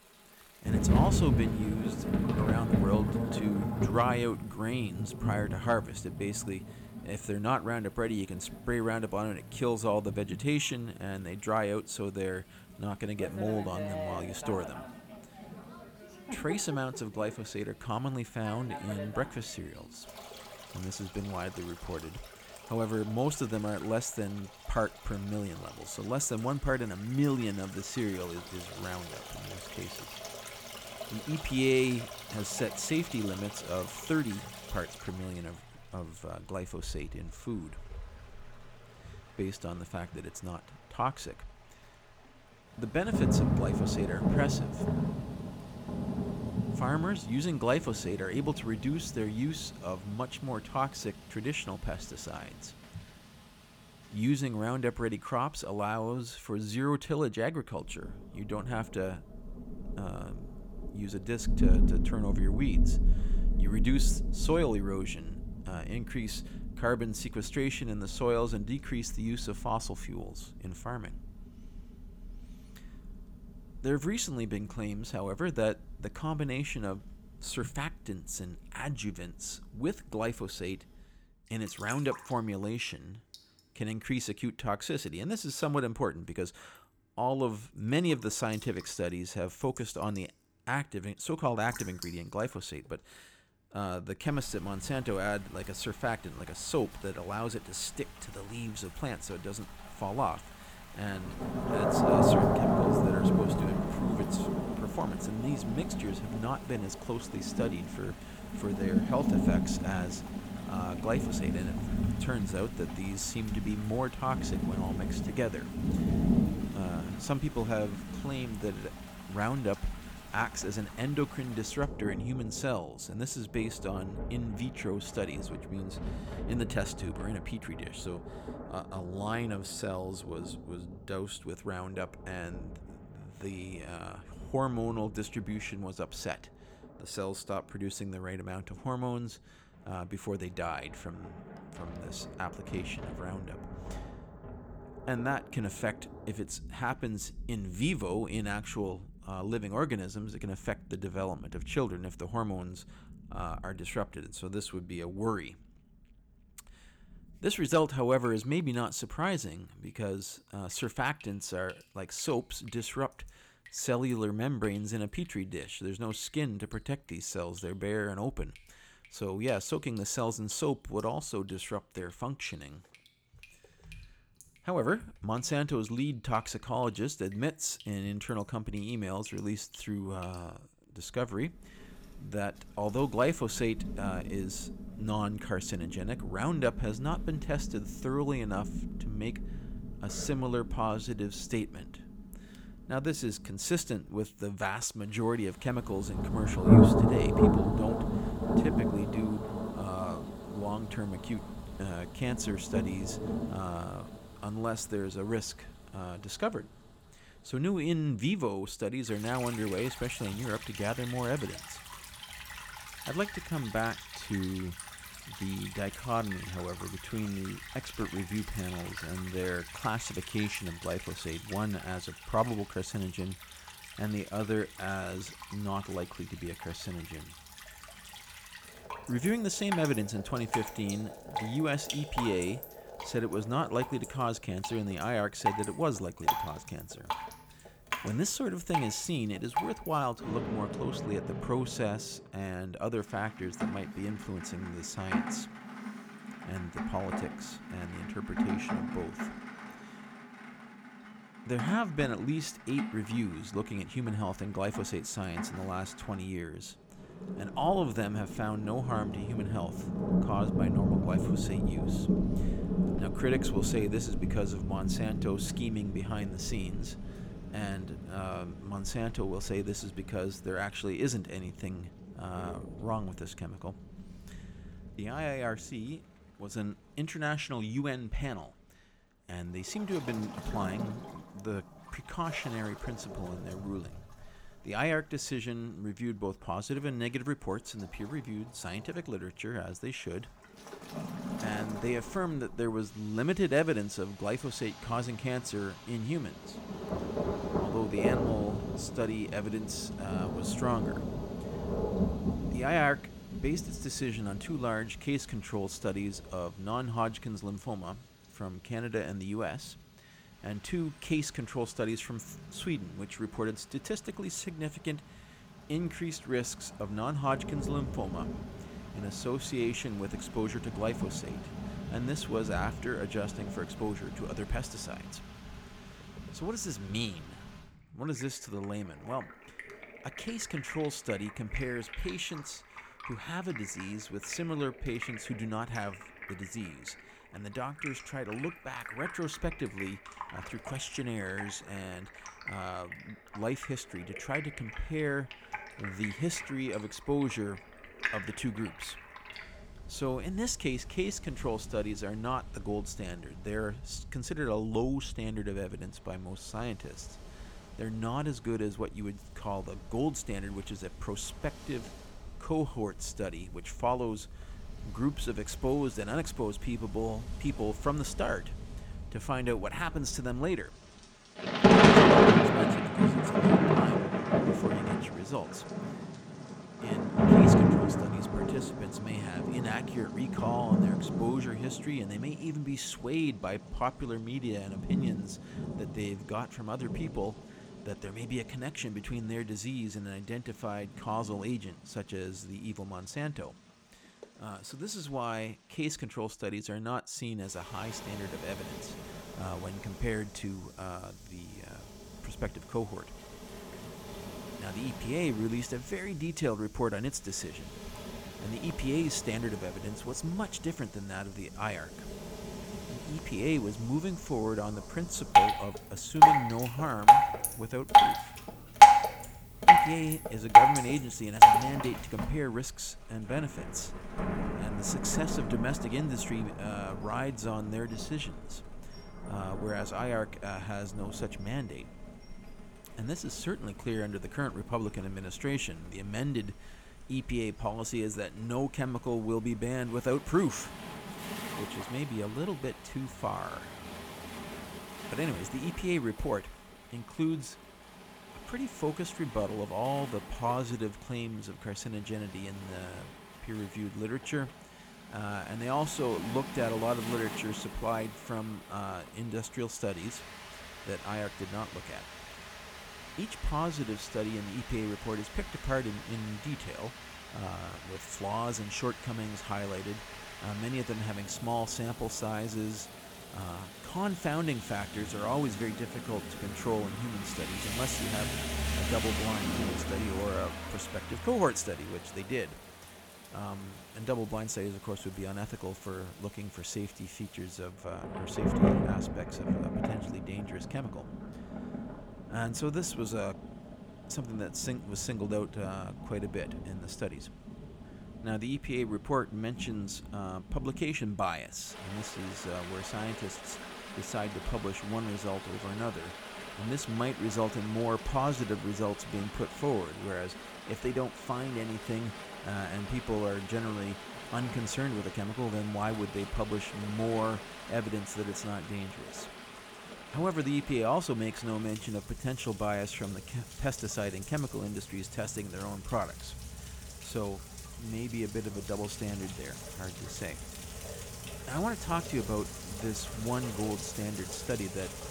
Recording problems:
rain or running water; very loud; throughout; 3 dB above the speech

